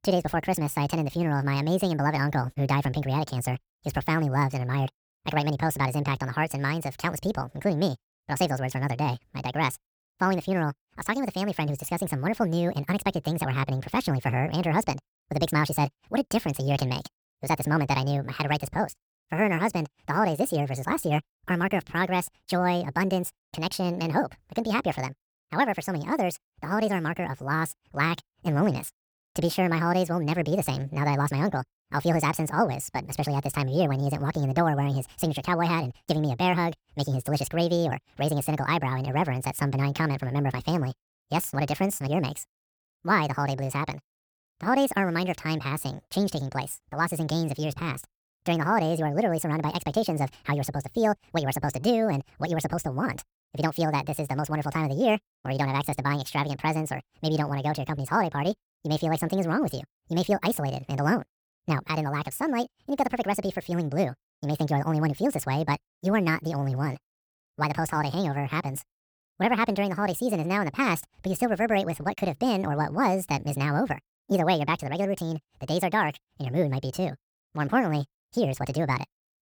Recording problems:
wrong speed and pitch; too fast and too high; 1.6 times normal speed

